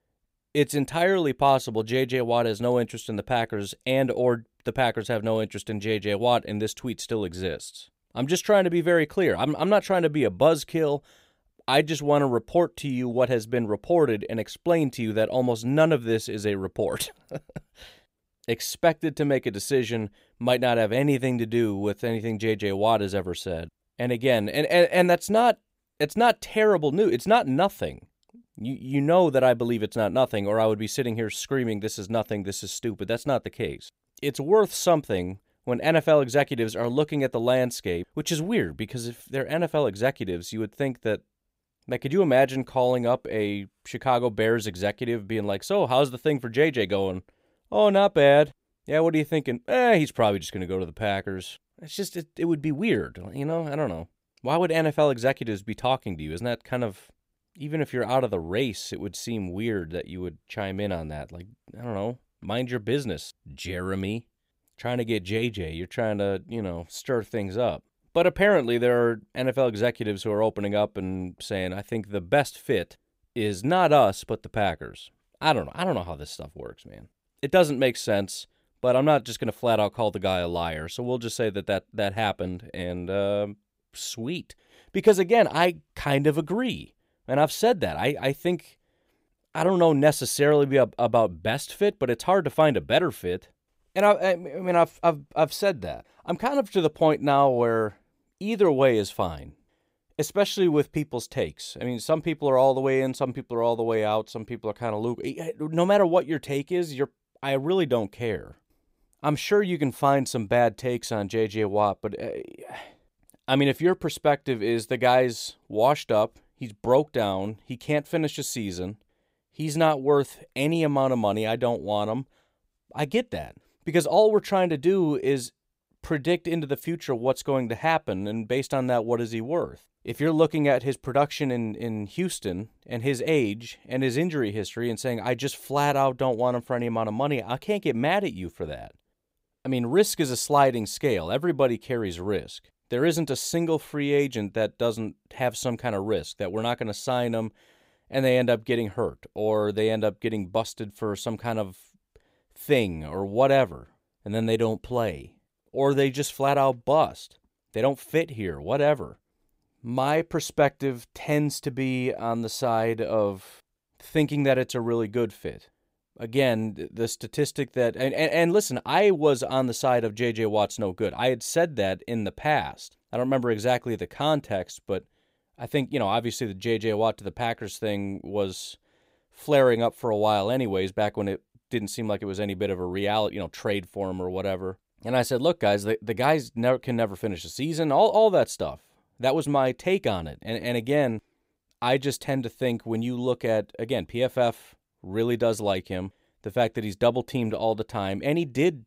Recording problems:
none

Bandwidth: 15.5 kHz